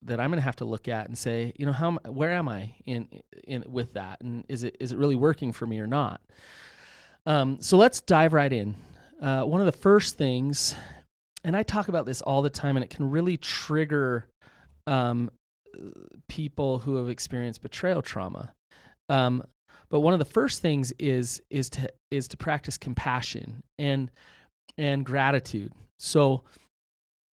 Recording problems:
garbled, watery; slightly

